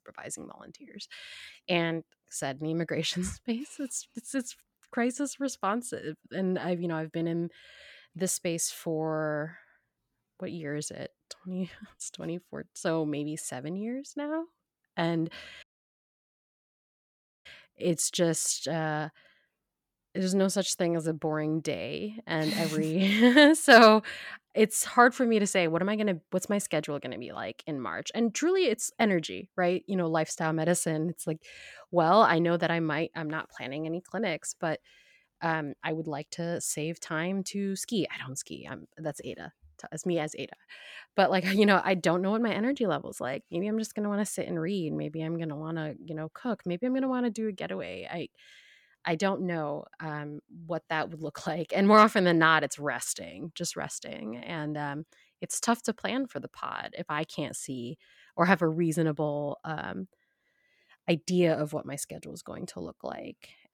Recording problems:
audio cutting out; at 16 s for 2 s

